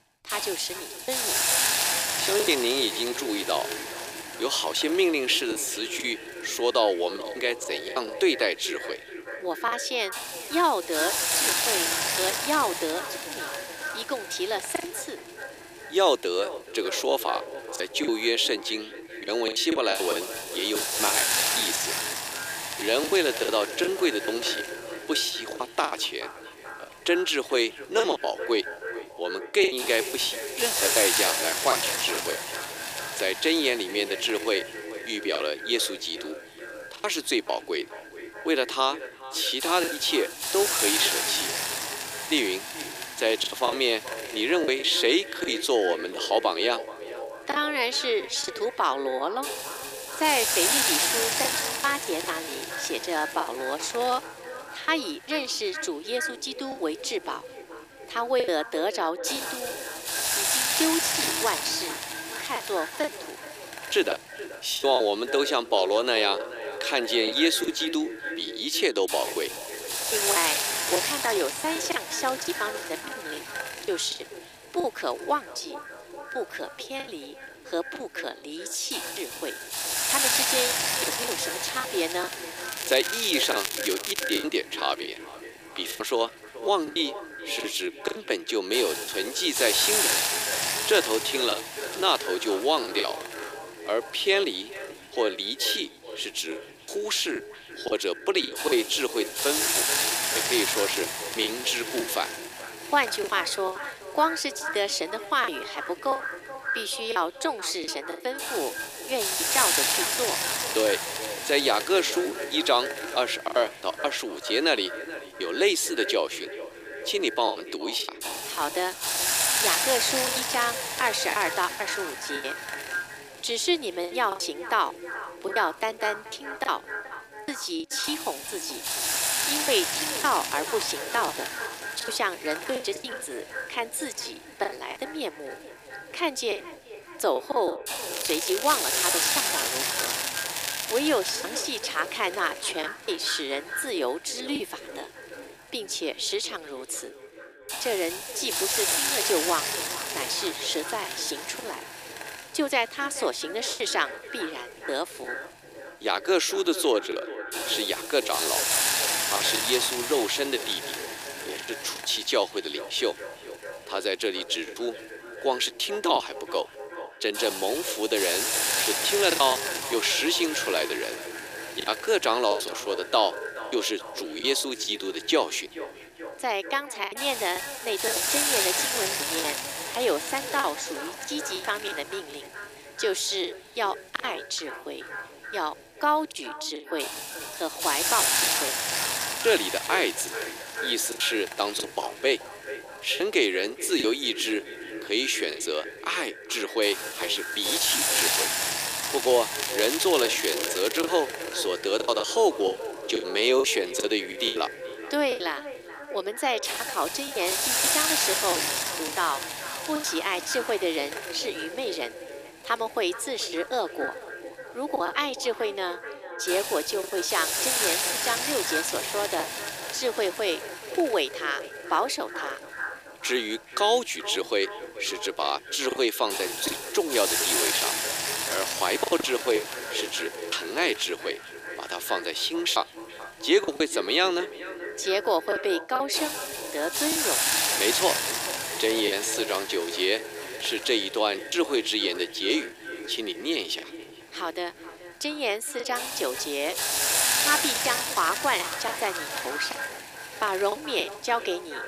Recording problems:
echo of what is said; strong; throughout; 430 ms later, 10 dB below the speech
thin; somewhat; fading below 350 Hz
hiss; loud; throughout; as loud as the speech
crackling; loud; from 1:23 to 1:24, from 2:18 to 2:21 and from 3:20 to 3:21; 4 dB below the speech
choppy; very; 8% of the speech affected

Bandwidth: 15 kHz